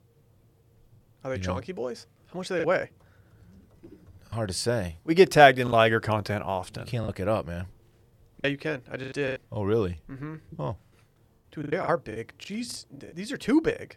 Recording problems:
choppy; very; 7% of the speech affected

